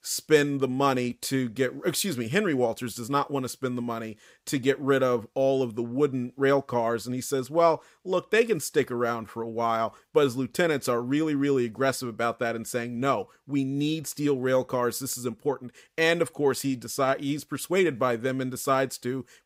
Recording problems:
none

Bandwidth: 15.5 kHz